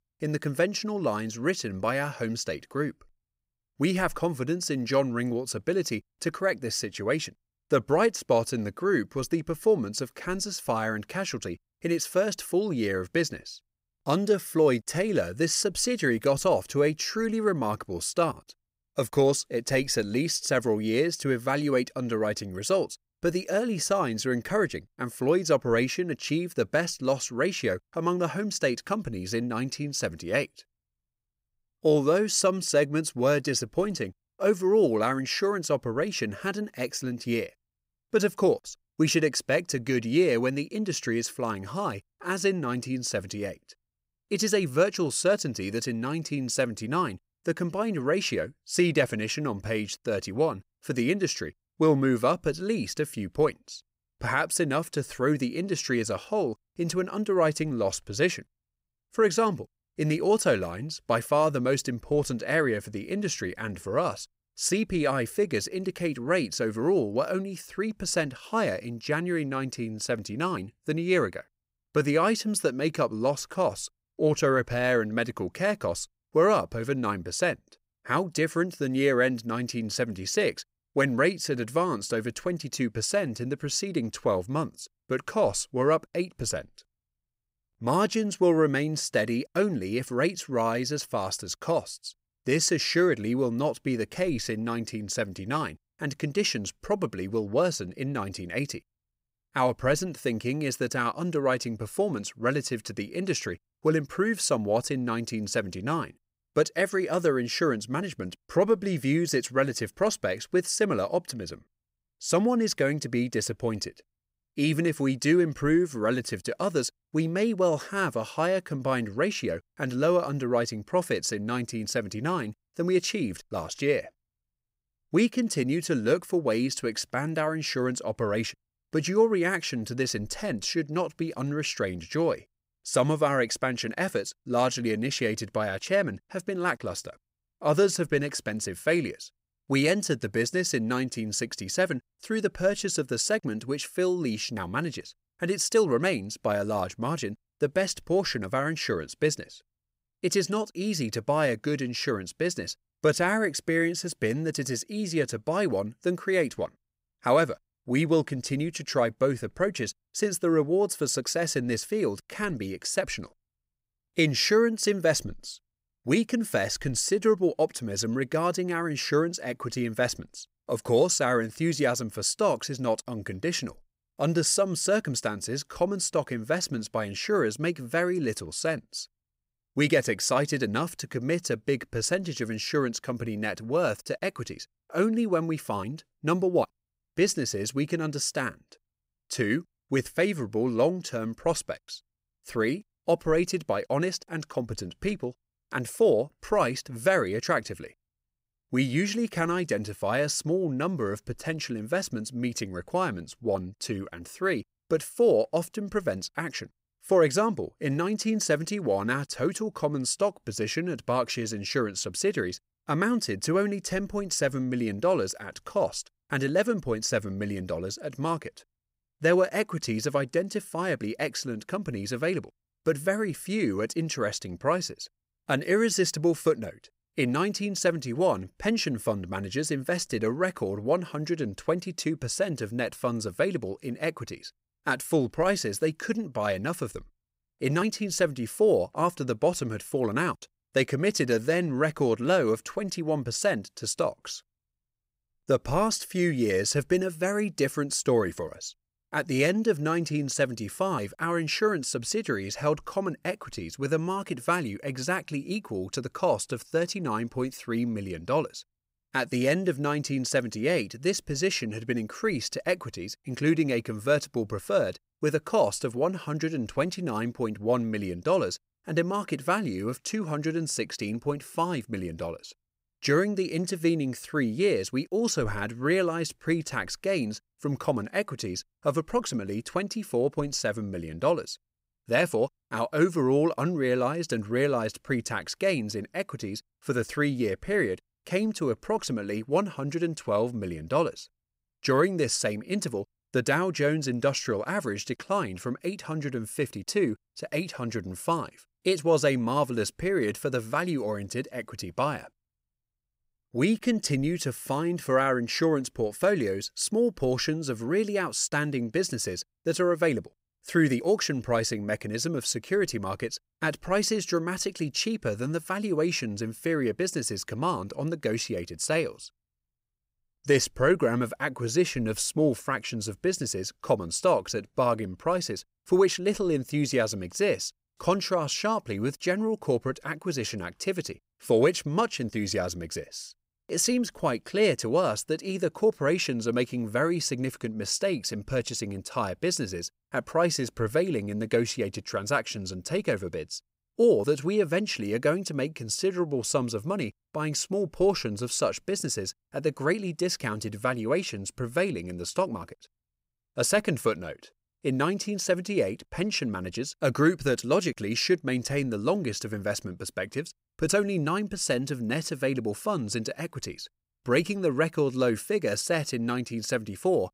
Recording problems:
none

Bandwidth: 15.5 kHz